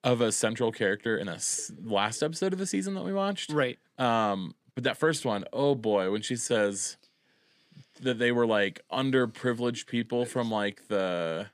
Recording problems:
uneven, jittery; strongly; from 1 to 10 s

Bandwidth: 15 kHz